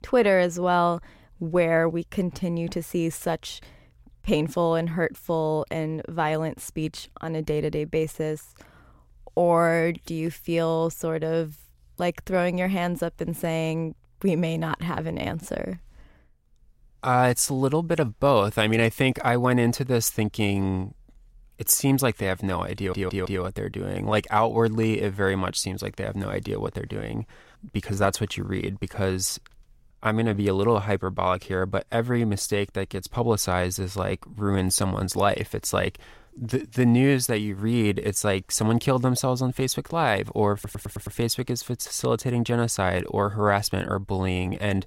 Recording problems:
audio stuttering; at 23 s and at 41 s

